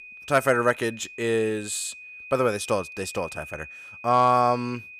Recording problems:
high-pitched whine; noticeable; throughout; 2.5 kHz, 15 dB below the speech

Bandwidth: 15 kHz